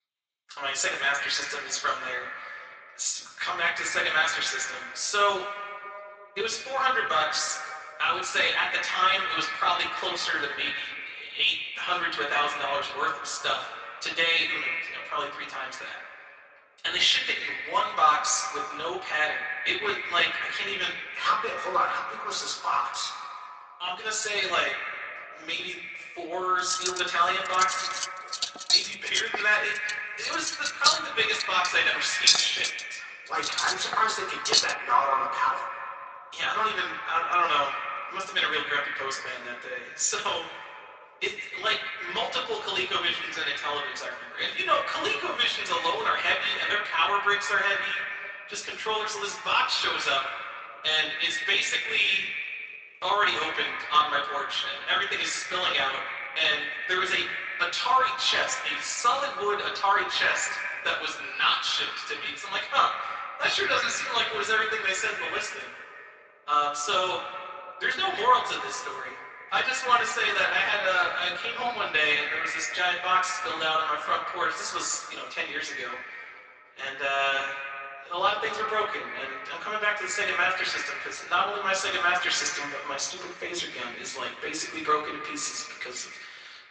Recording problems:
echo of what is said; strong; throughout; 150 ms later, 7 dB below the speech
off-mic speech; far
thin; very; fading below 800 Hz
room echo; slight; dies away in 0.3 s
garbled, watery; slightly; nothing above 7.5 kHz
clattering dishes; loud; from 27 to 35 s; peak 6 dB above the speech

